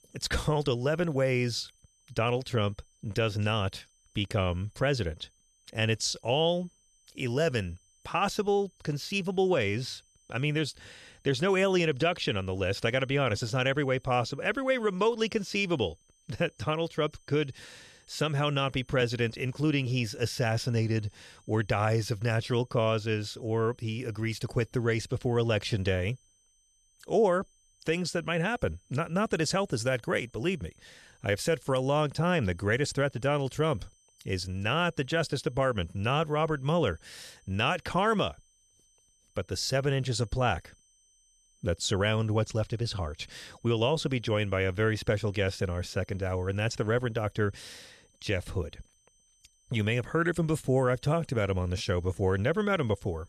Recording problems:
high-pitched whine; faint; throughout; 6 kHz, 35 dB below the speech

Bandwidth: 13.5 kHz